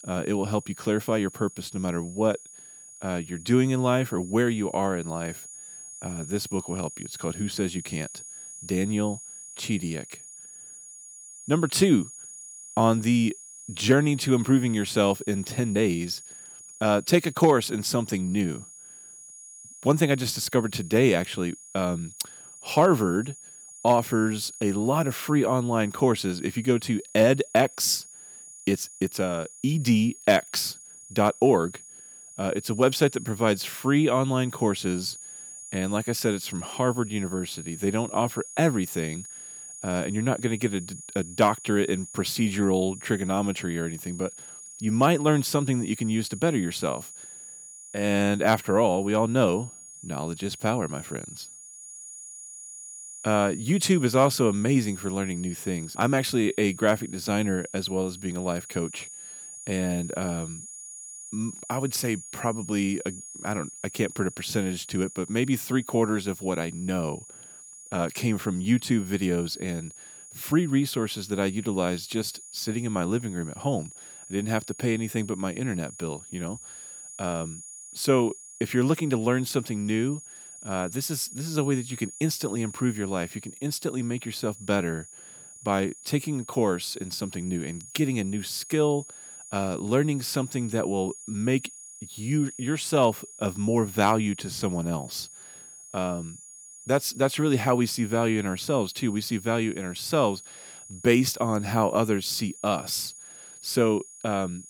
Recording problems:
high-pitched whine; noticeable; throughout; 7 kHz, 15 dB below the speech

